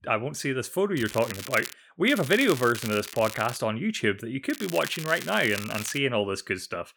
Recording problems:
crackling; noticeable; at 1 s, from 2 to 3.5 s and from 4.5 to 6 s; 10 dB below the speech

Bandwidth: 19 kHz